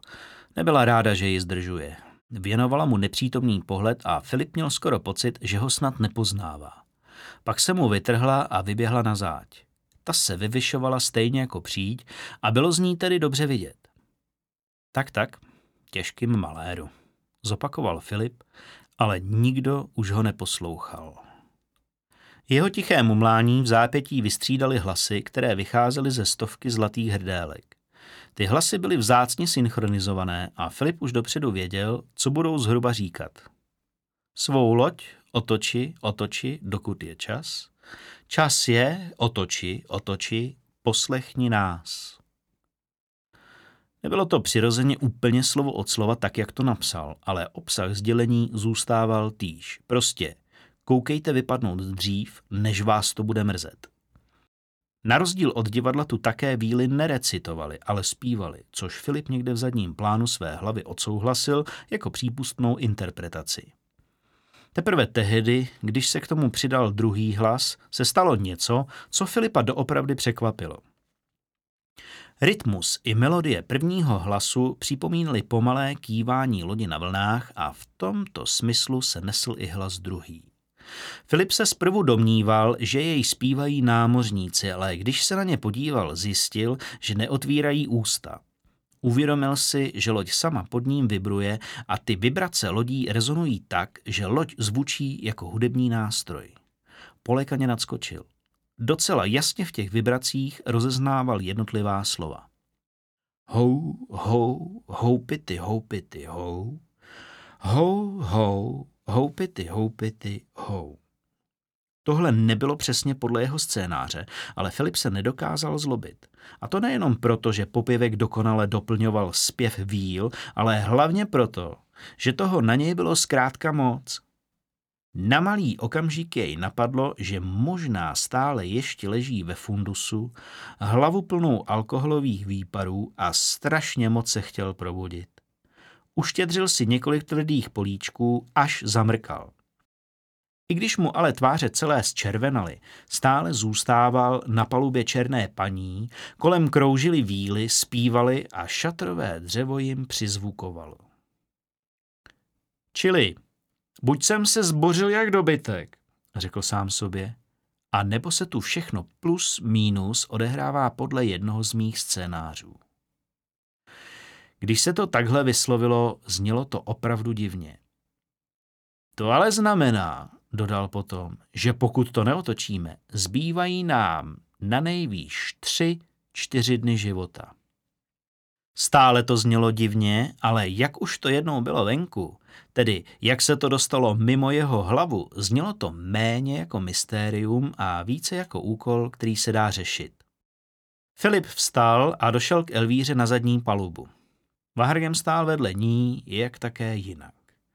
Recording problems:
none

